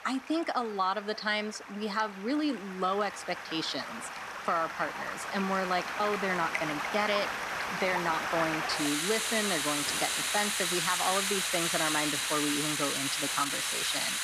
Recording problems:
rain or running water; very loud; throughout; 1 dB above the speech

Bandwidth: 14 kHz